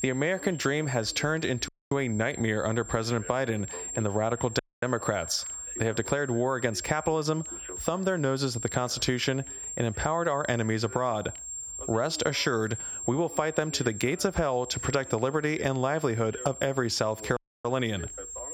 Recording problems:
squashed, flat; somewhat, background pumping
high-pitched whine; noticeable; throughout; 7.5 kHz, 10 dB below the speech
voice in the background; faint; throughout; 20 dB below the speech
audio cutting out; at 1.5 s, at 4.5 s and at 17 s

